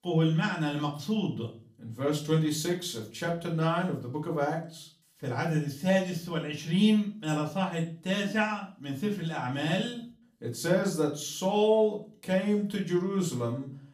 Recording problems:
off-mic speech; far
room echo; slight; dies away in 0.4 s

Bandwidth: 15 kHz